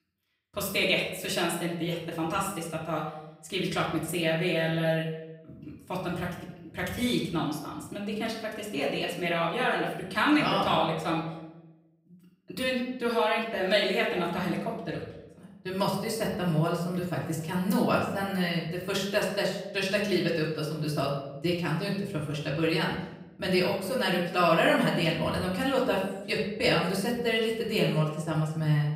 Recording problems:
off-mic speech; far
room echo; noticeable; dies away in 0.7 s

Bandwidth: 15.5 kHz